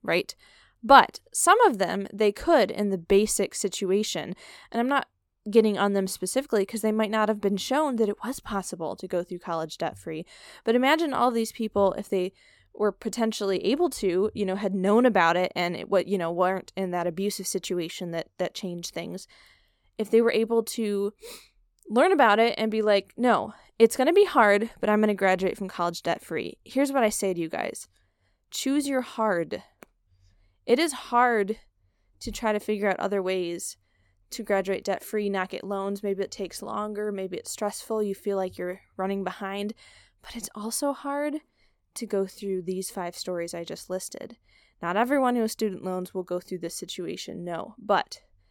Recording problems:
none

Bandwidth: 17.5 kHz